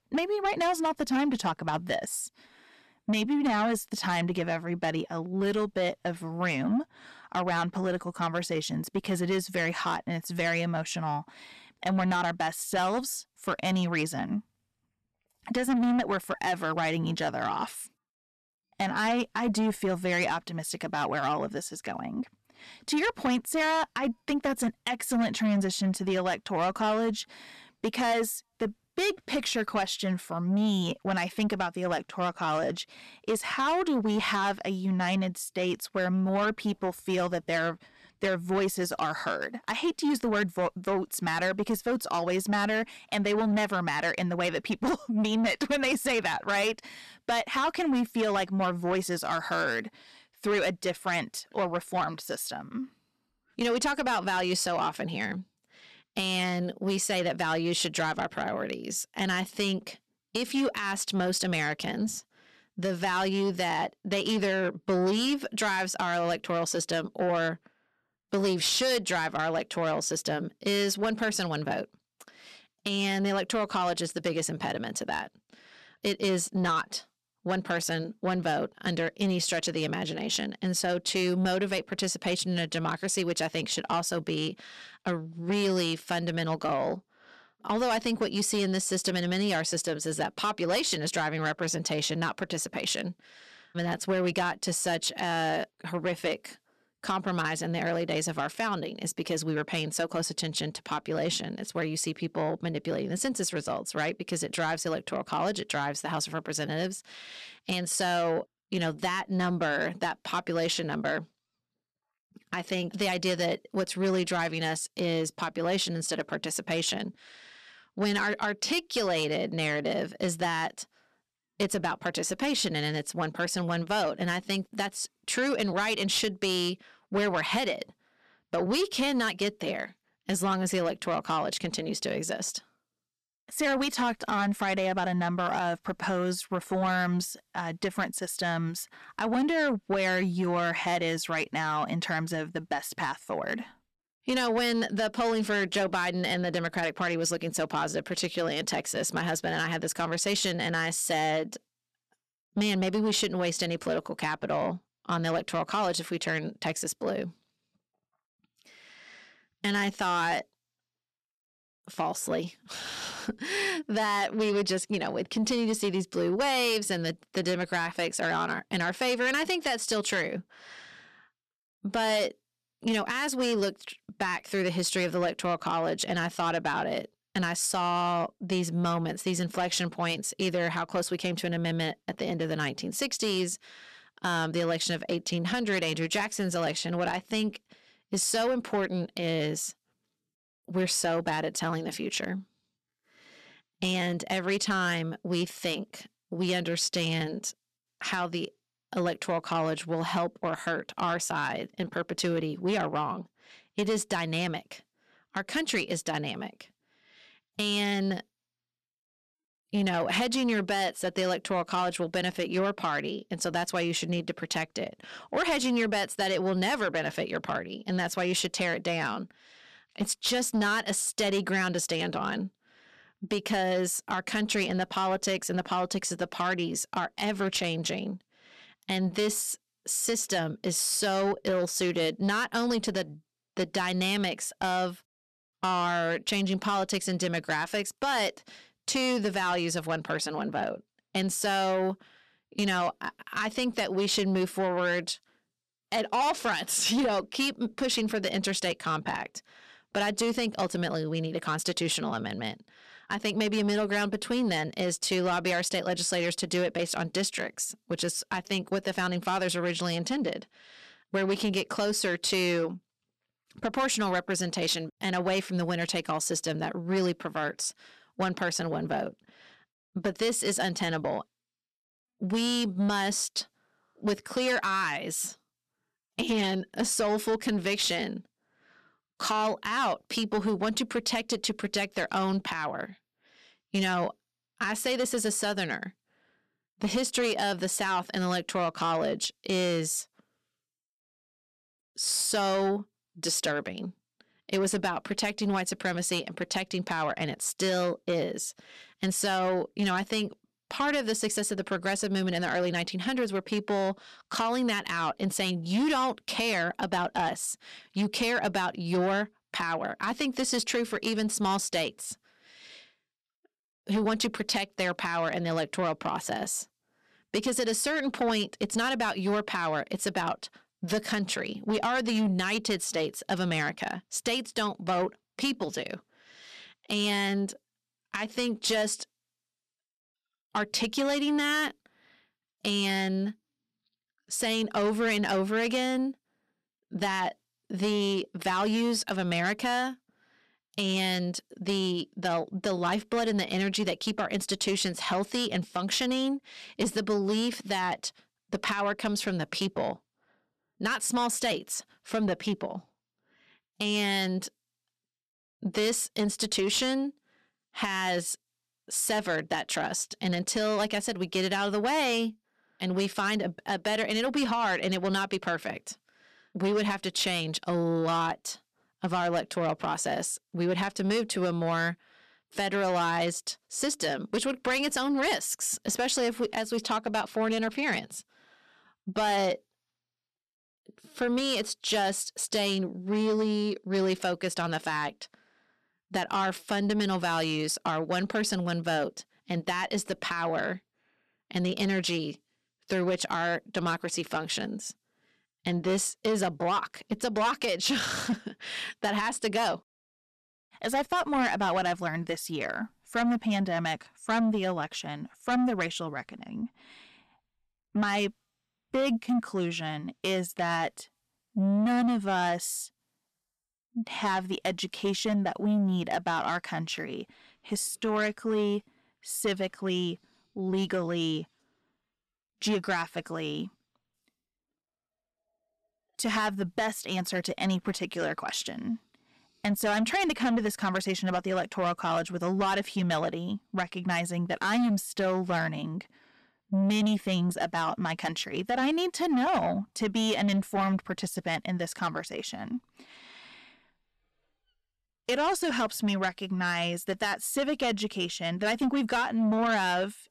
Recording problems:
distortion; slight; 10 dB below the speech

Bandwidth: 13.5 kHz